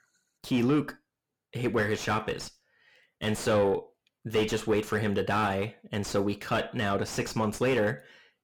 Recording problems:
distortion; heavy; 5 dB below the speech

